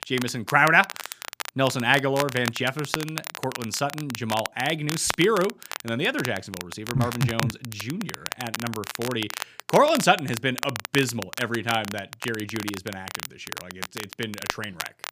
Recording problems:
crackle, like an old record; loud; 9 dB below the speech

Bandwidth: 15 kHz